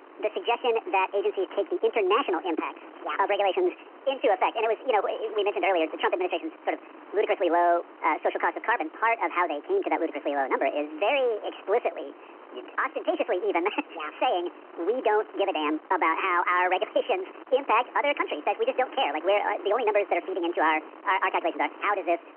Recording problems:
wrong speed and pitch; too fast and too high; 1.6 times normal speed
phone-call audio
wind noise on the microphone; occasional gusts; 20 dB below the speech

